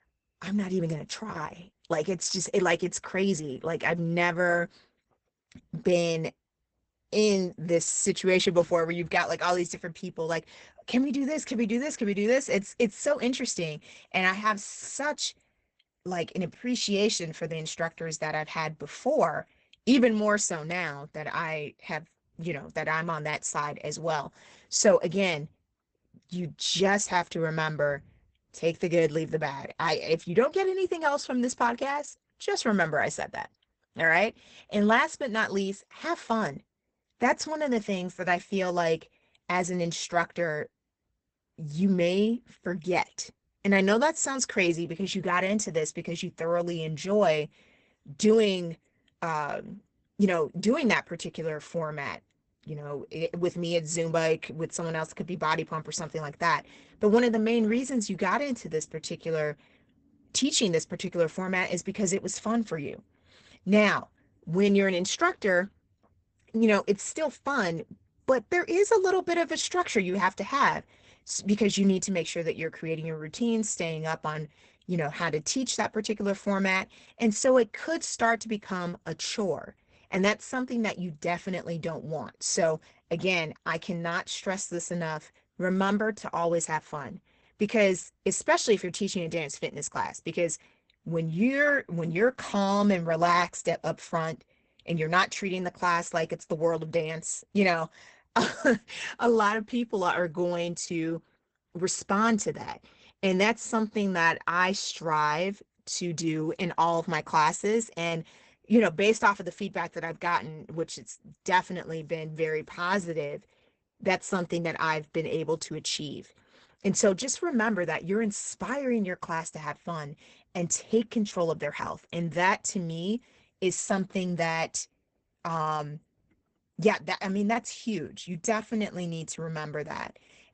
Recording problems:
garbled, watery; badly; nothing above 8 kHz

